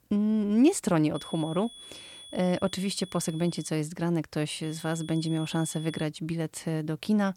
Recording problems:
high-pitched whine; noticeable; from 1 to 3.5 s and from 4.5 to 6 s; 3.5 kHz, 15 dB below the speech

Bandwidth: 18.5 kHz